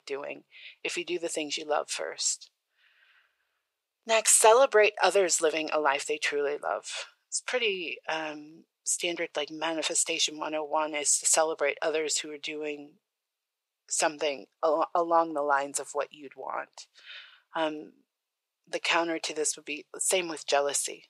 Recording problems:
thin; very; fading below 450 Hz

